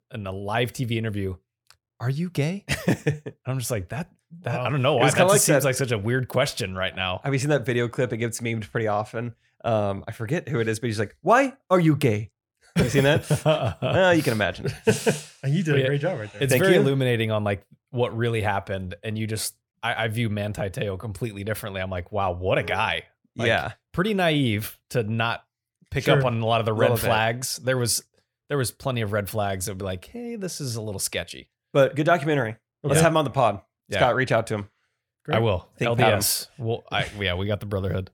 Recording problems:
none

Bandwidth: 18 kHz